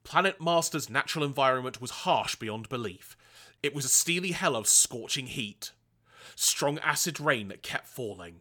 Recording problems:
none

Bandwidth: 18.5 kHz